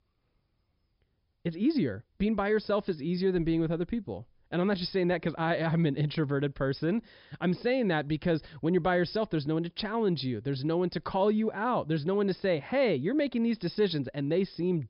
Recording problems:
high frequencies cut off; noticeable; nothing above 5.5 kHz

